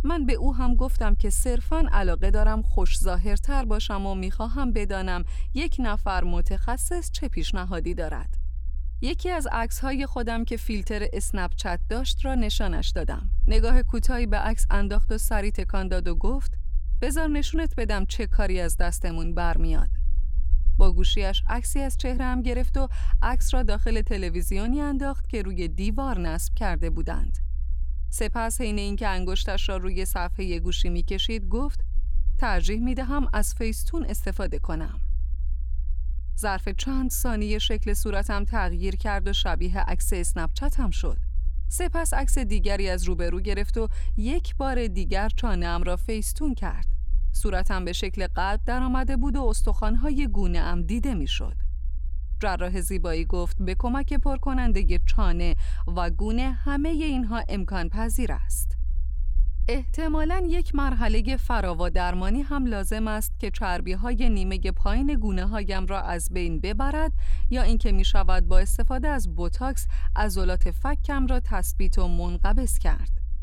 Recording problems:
low rumble; faint; throughout; 25 dB below the speech

